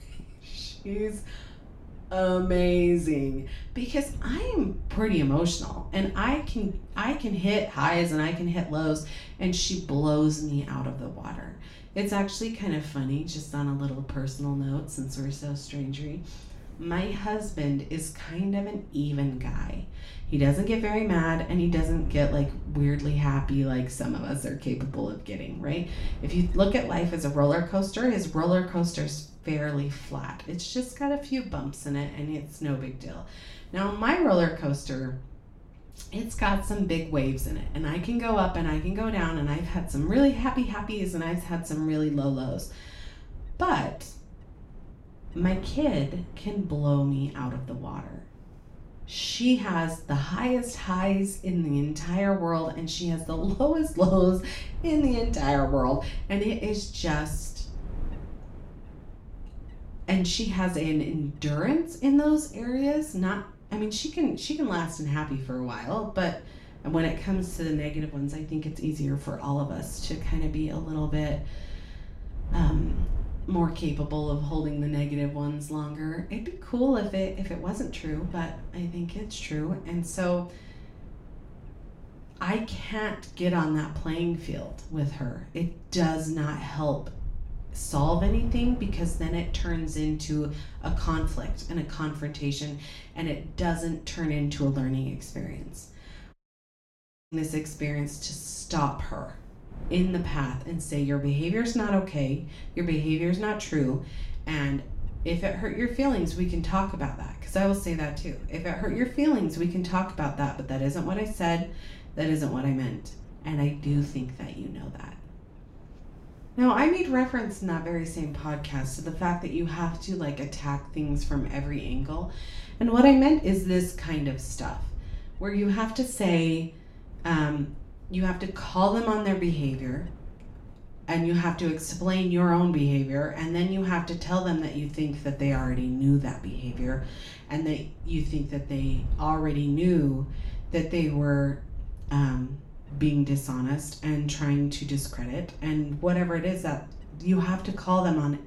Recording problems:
off-mic speech; far
room echo; slight; dies away in 0.4 s
wind noise on the microphone; occasional gusts; 25 dB below the speech
audio cutting out; at 1:36 for 1 s

